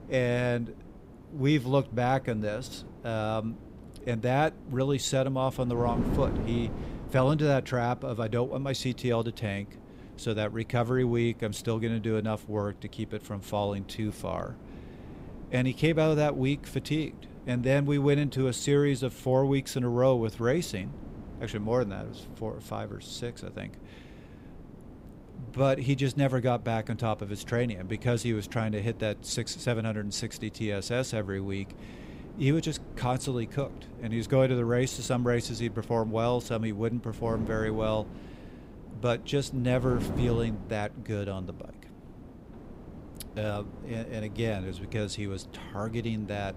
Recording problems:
wind noise on the microphone; occasional gusts; 15 dB below the speech

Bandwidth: 15.5 kHz